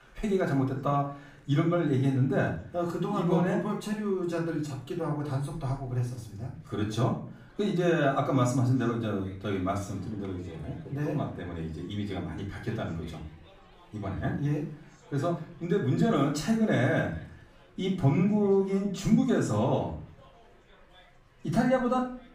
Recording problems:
off-mic speech; far
room echo; slight; dies away in 0.4 s
chatter from many people; faint; throughout; 30 dB below the speech

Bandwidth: 15.5 kHz